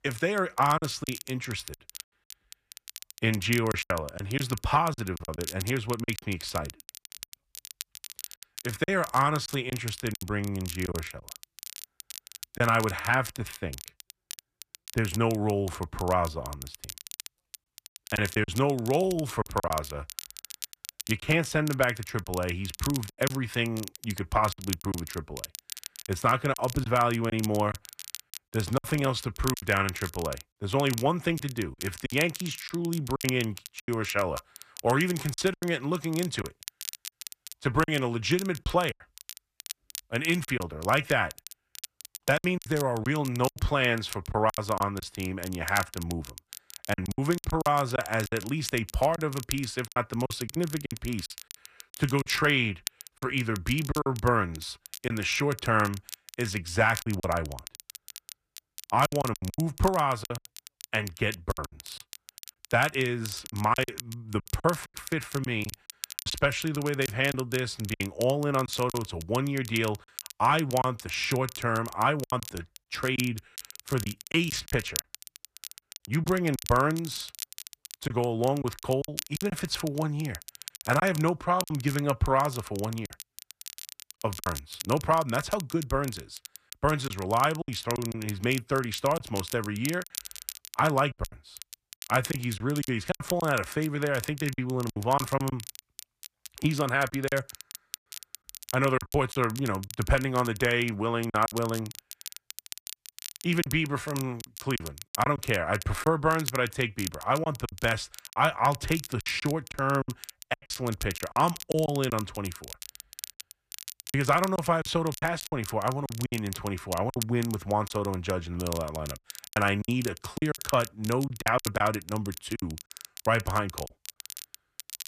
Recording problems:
crackle, like an old record; noticeable; 15 dB below the speech
choppy; very; 9% of the speech affected

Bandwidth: 14.5 kHz